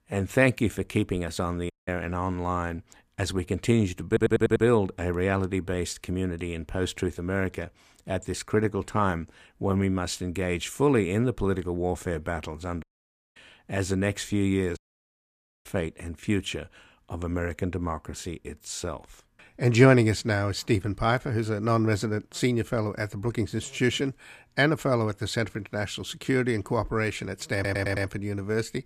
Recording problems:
audio cutting out; at 1.5 s, at 13 s for 0.5 s and at 15 s for 1 s
audio stuttering; at 4 s and at 28 s

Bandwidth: 14.5 kHz